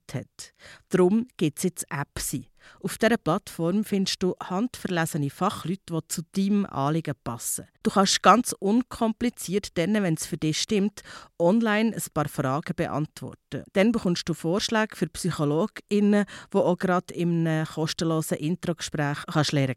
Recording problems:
none

